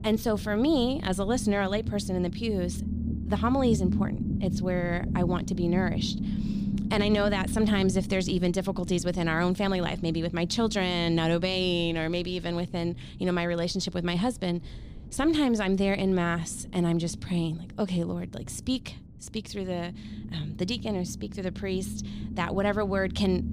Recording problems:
low rumble; noticeable; throughout; 10 dB below the speech

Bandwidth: 14.5 kHz